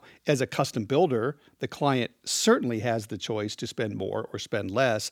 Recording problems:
none

